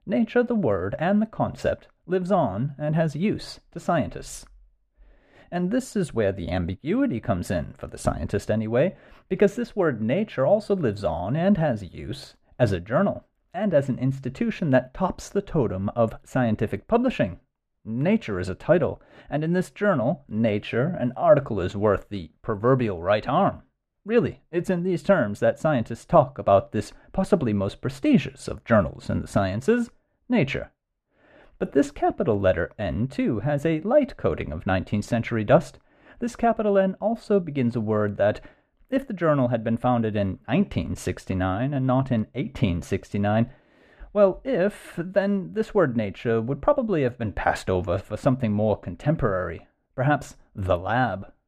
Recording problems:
muffled; very; fading above 3.5 kHz

